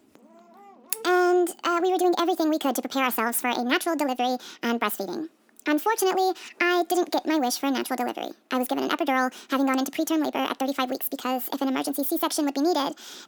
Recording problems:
wrong speed and pitch; too fast and too high; 1.5 times normal speed

